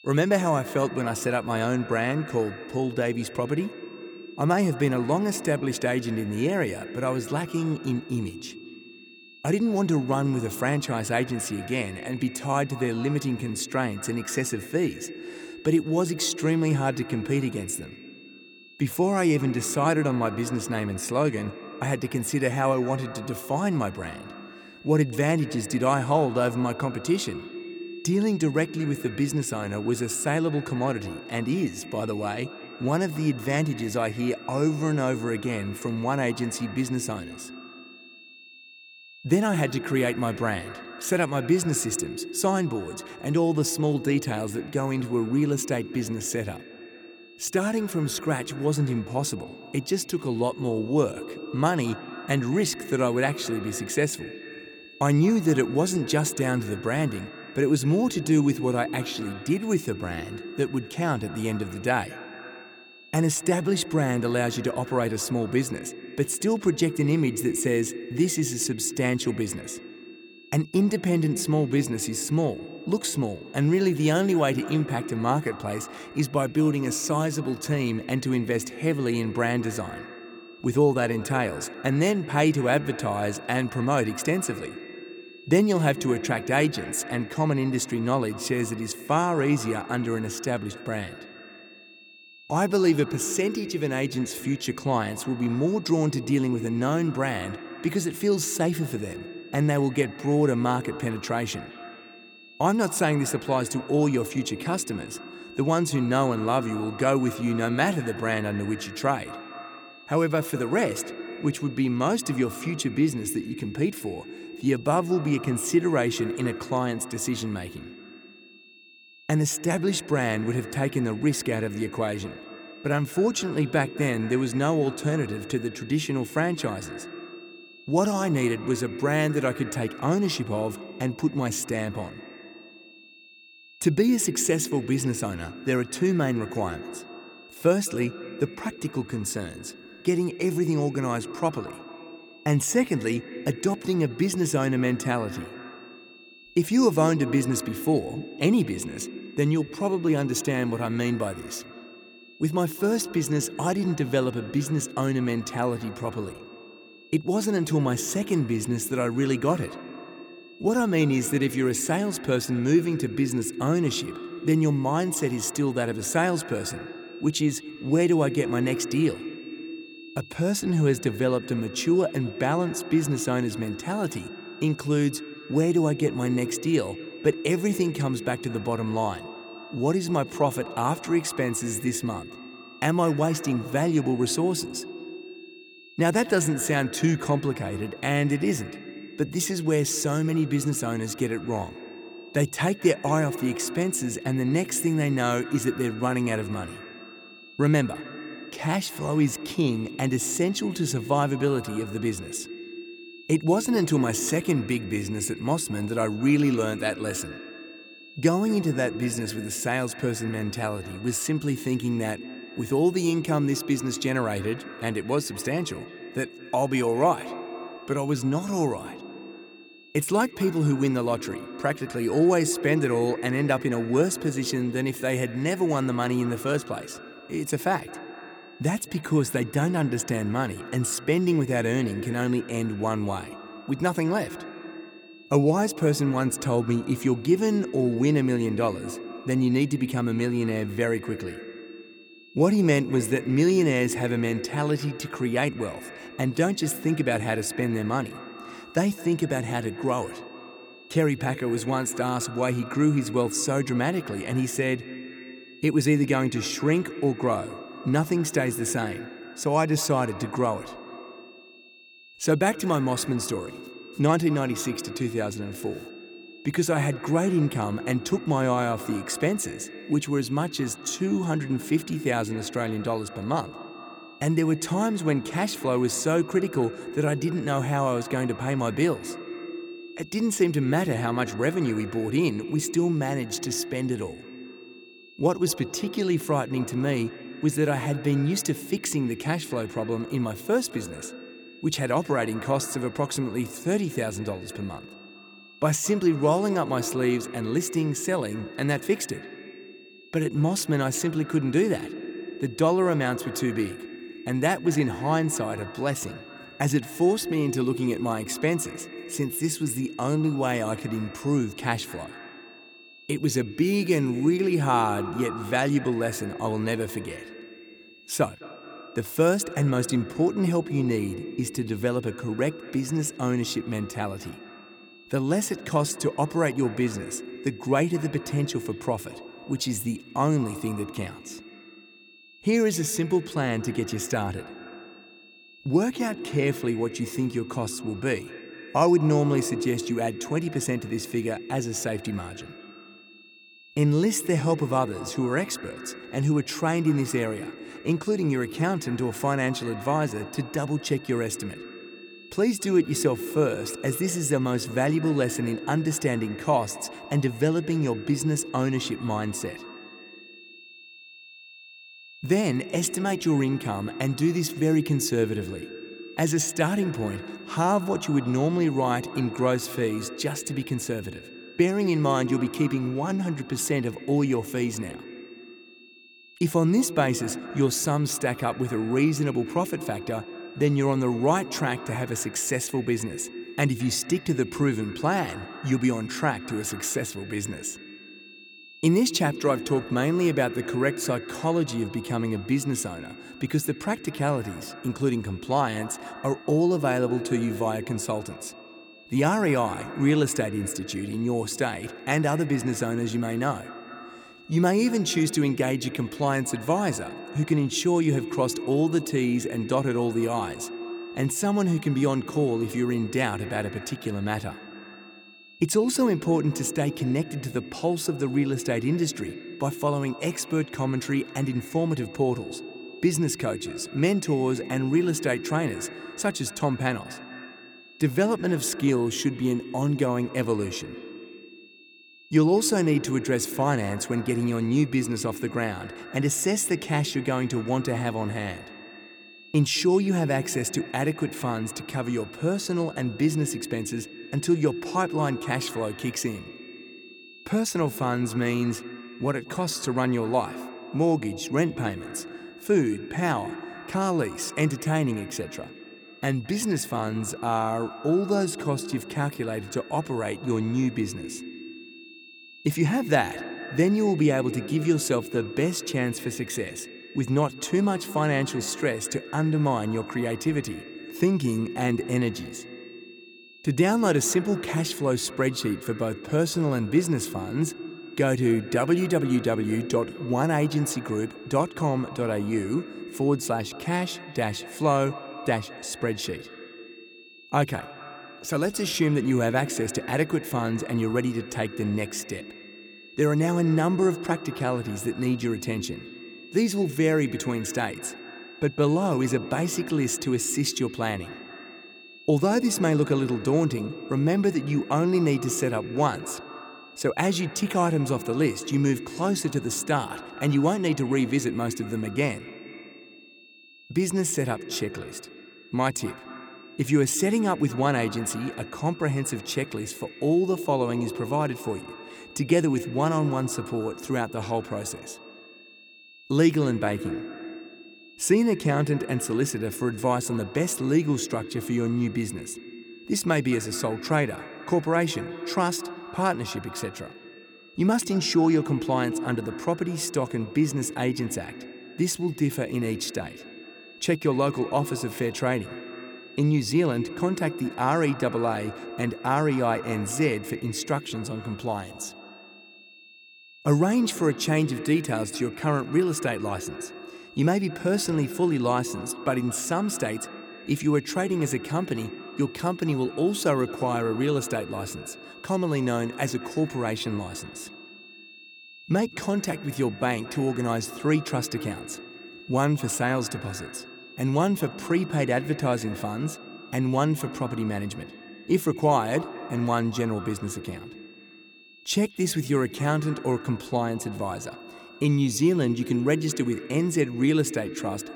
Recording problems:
echo of what is said; noticeable; throughout; 210 ms later, 15 dB below the speech
high-pitched whine; faint; throughout; 2.5 kHz, 20 dB below the speech

